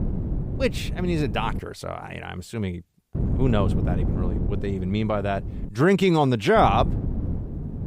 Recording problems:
wind noise on the microphone; occasional gusts; until 1.5 s, from 3 to 5.5 s and from 6.5 s on; 15 dB below the speech

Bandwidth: 15.5 kHz